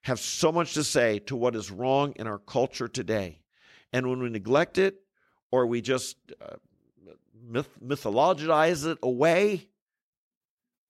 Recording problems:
none

